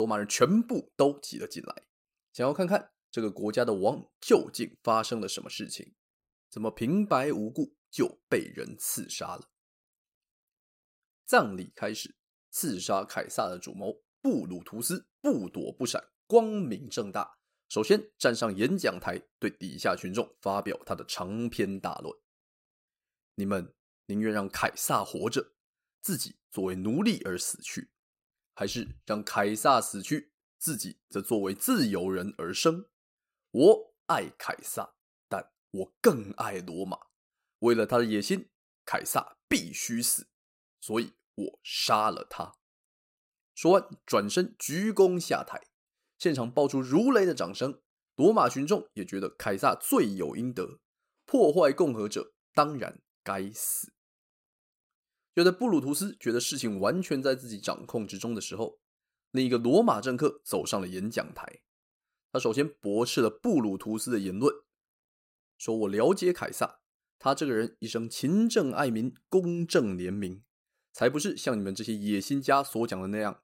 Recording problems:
abrupt cut into speech; at the start

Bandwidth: 16 kHz